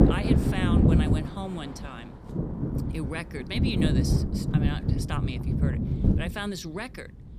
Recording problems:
wind noise on the microphone; heavy; 2 dB above the speech

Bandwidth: 15 kHz